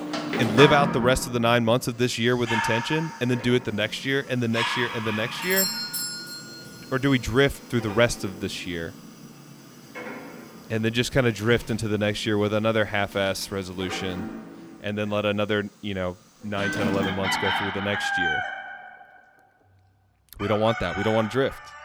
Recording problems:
animal sounds; loud; throughout; 5 dB below the speech
doorbell; loud; at 5.5 s; peak 1 dB above the speech

